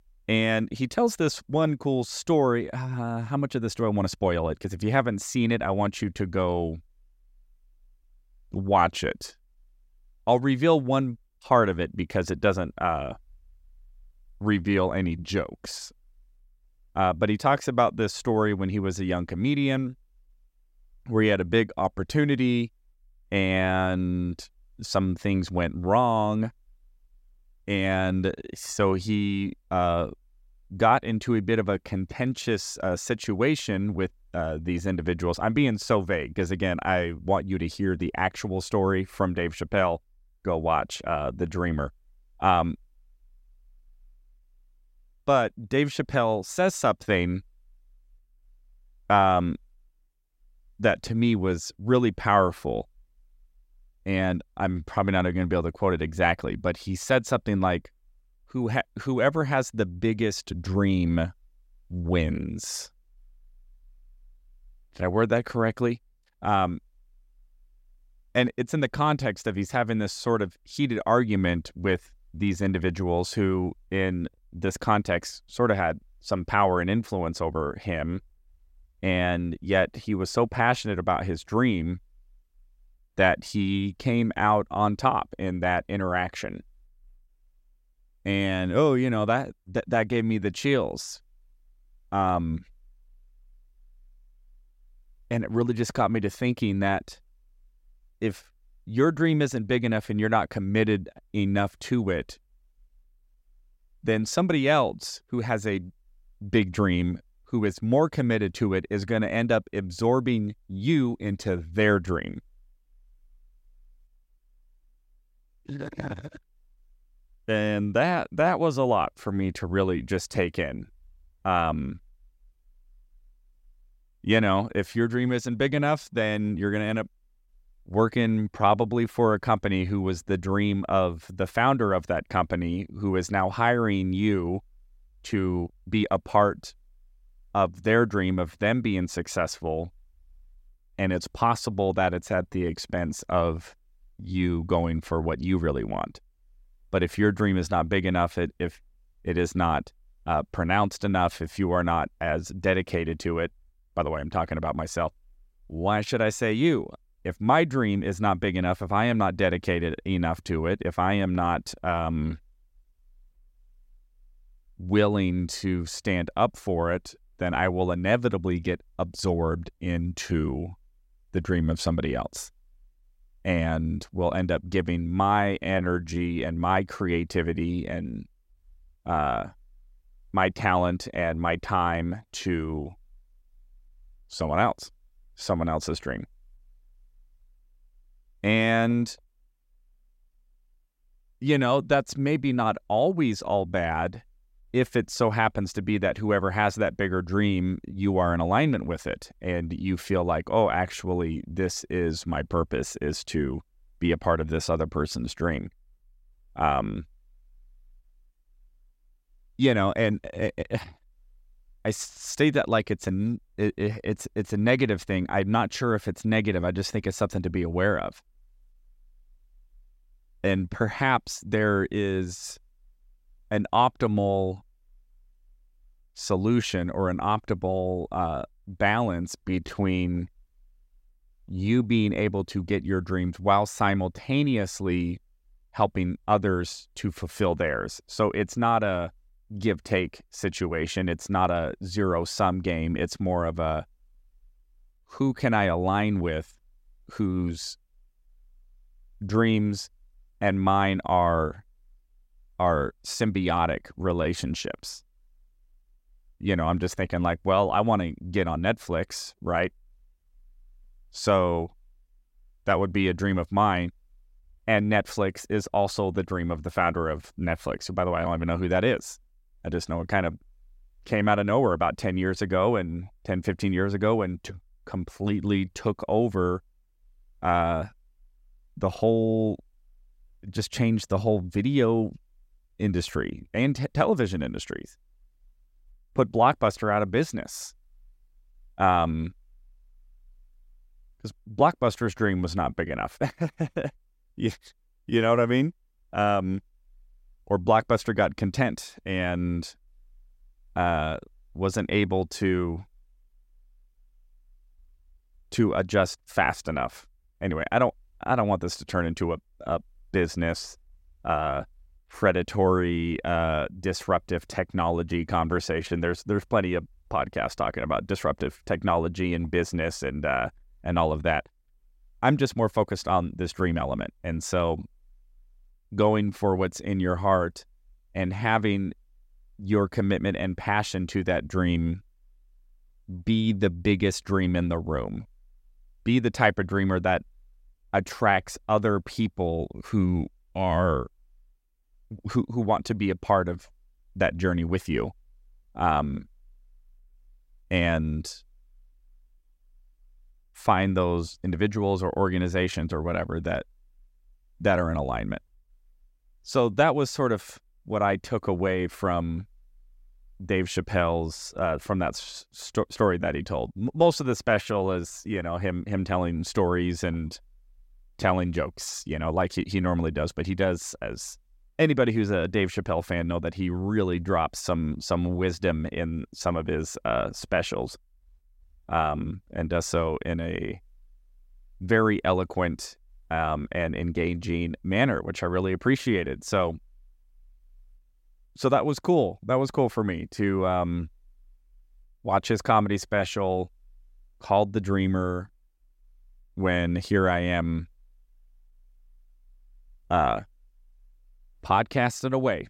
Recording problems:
uneven, jittery; strongly; from 4 s to 6:05

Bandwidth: 16 kHz